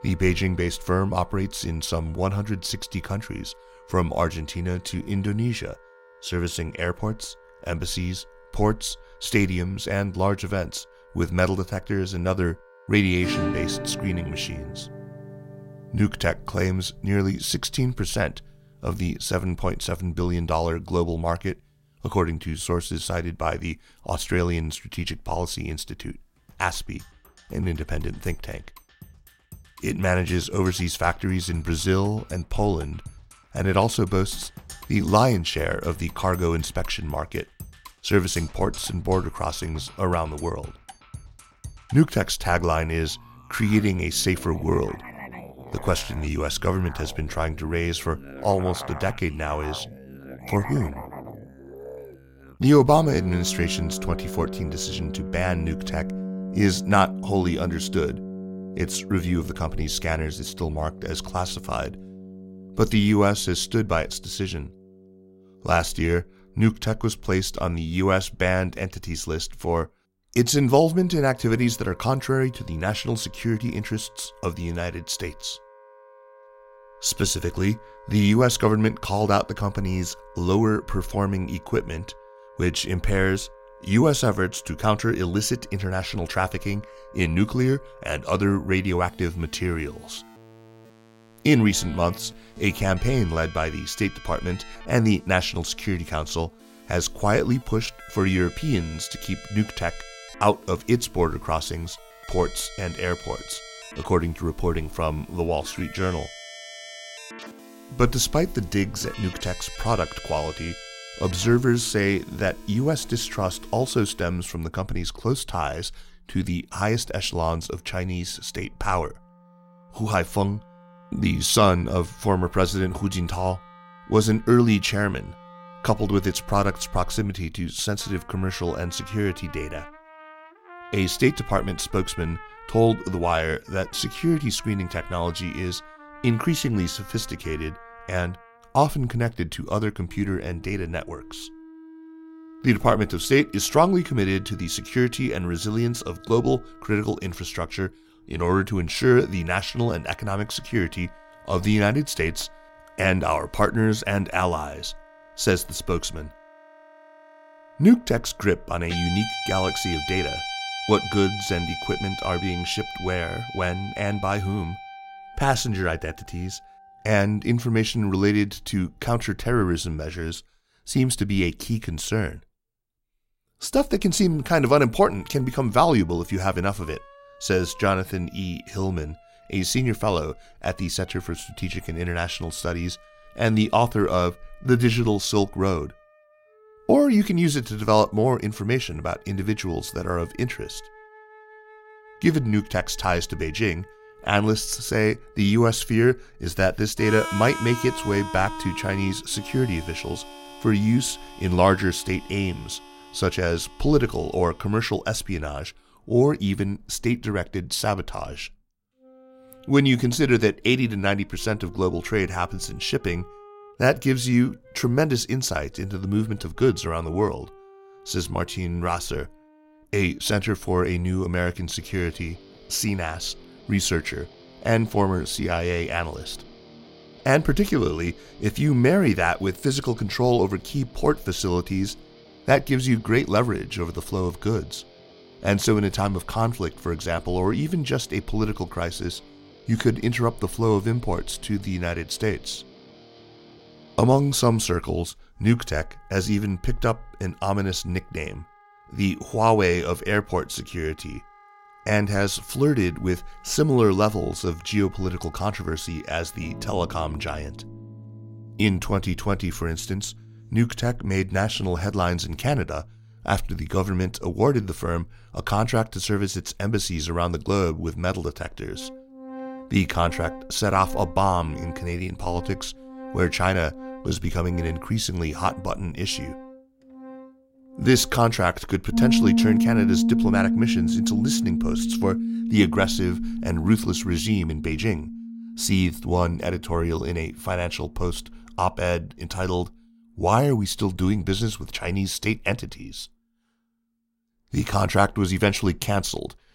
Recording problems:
background music; noticeable; throughout; 10 dB below the speech

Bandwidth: 16 kHz